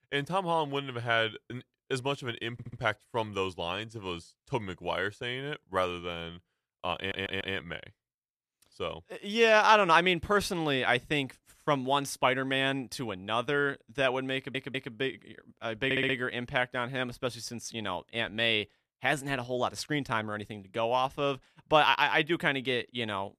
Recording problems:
audio stuttering; 4 times, first at 2.5 s

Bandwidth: 14.5 kHz